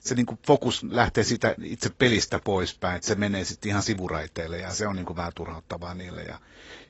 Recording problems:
garbled, watery; badly; nothing above 7.5 kHz

